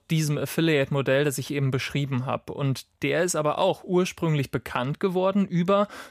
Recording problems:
none

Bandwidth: 15 kHz